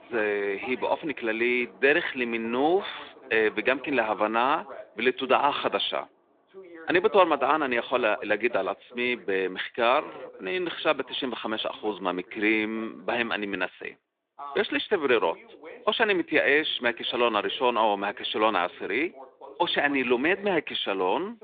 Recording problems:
phone-call audio; nothing above 3.5 kHz
animal sounds; faint; throughout; 30 dB below the speech
voice in the background; faint; throughout; 20 dB below the speech

